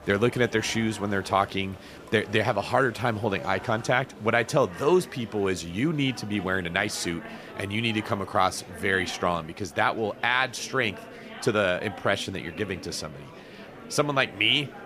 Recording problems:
murmuring crowd; noticeable; throughout; 15 dB below the speech

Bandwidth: 14.5 kHz